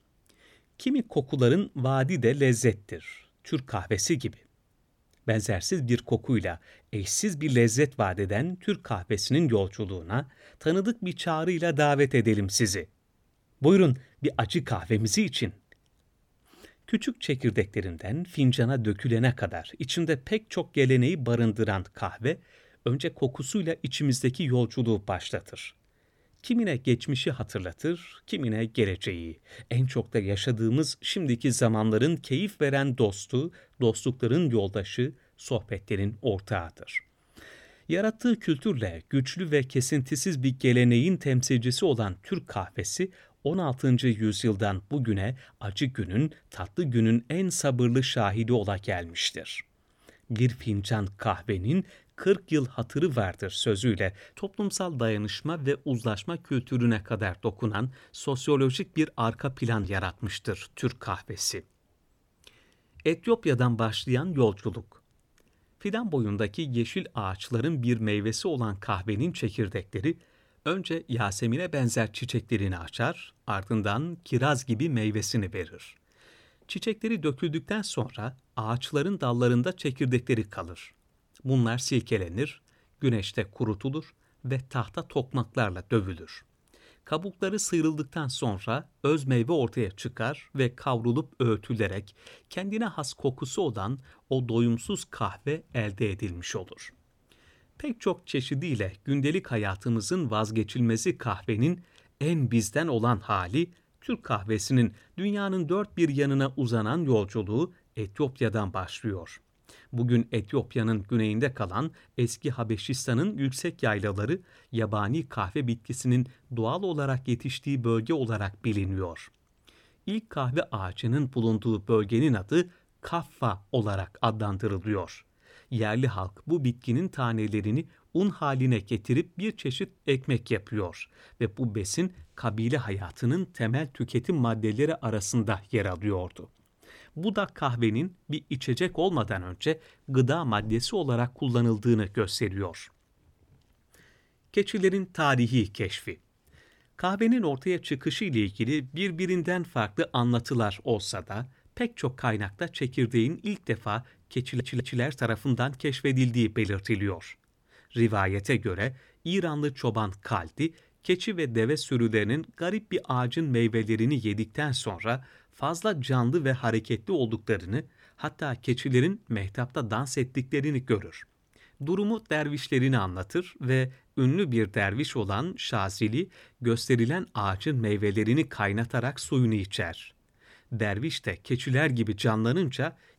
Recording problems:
audio stuttering; at 2:34

